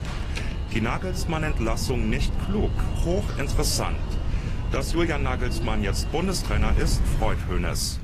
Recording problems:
garbled, watery; slightly; nothing above 14.5 kHz
wind noise on the microphone; occasional gusts; 15 dB below the speech
rain or running water; faint; throughout; 20 dB below the speech
alarm; noticeable; until 7.5 s; peak 7 dB below the speech

